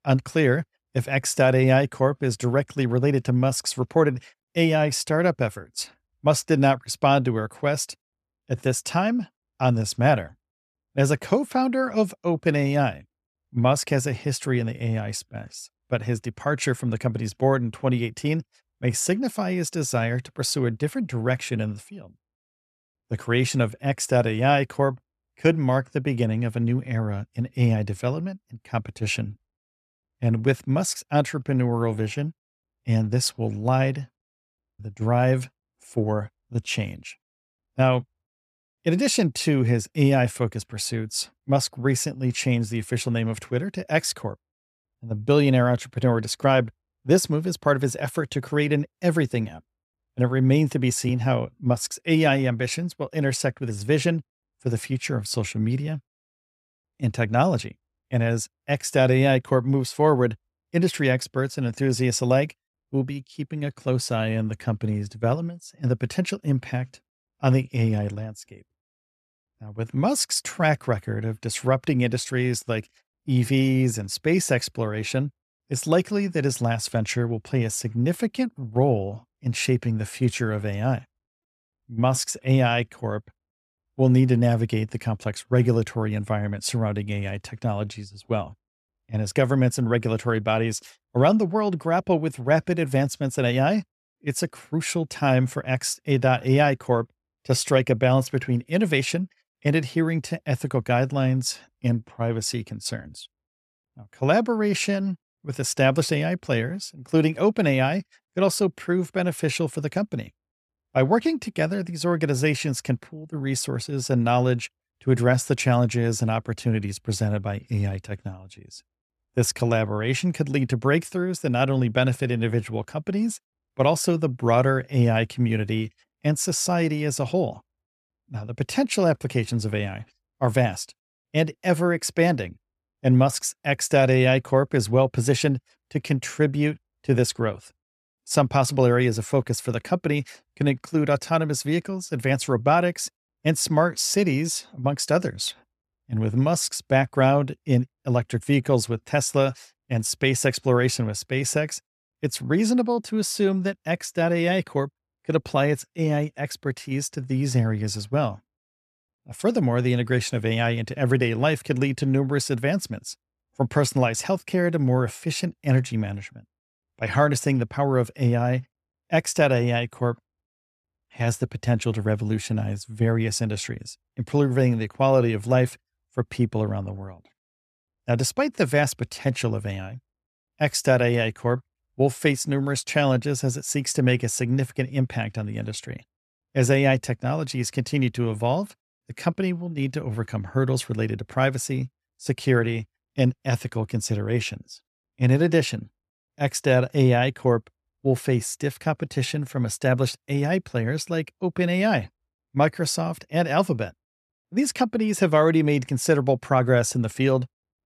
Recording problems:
none

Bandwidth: 14 kHz